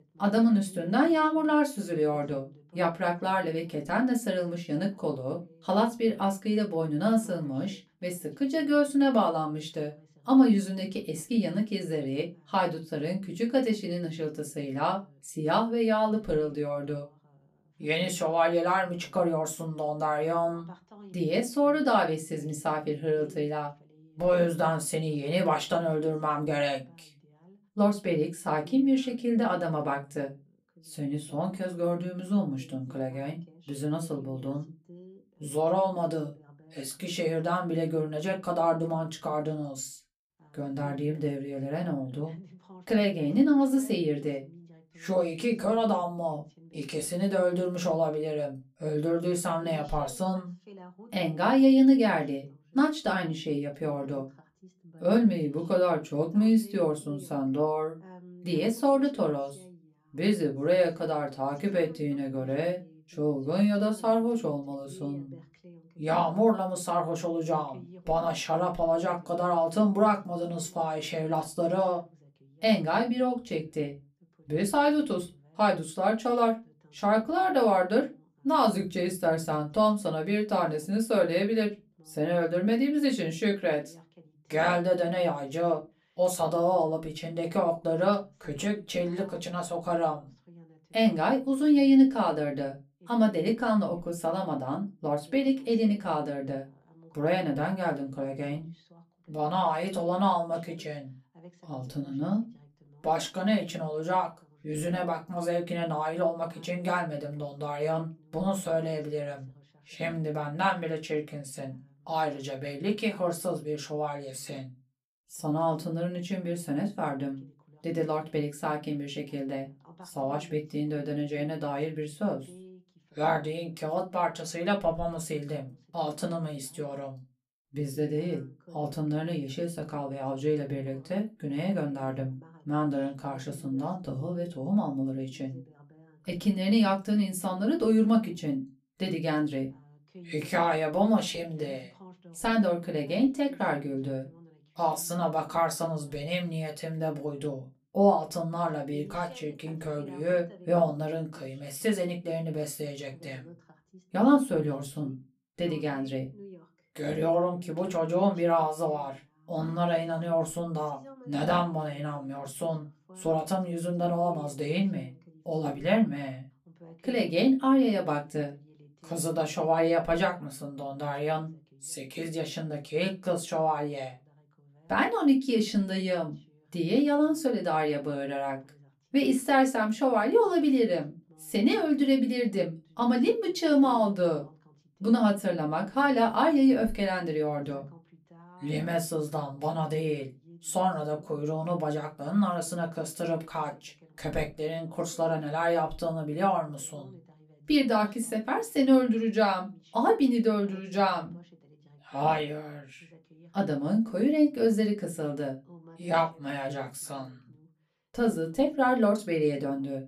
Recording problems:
off-mic speech; far
room echo; very slight; dies away in 0.2 s
voice in the background; faint; throughout; 25 dB below the speech

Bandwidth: 14.5 kHz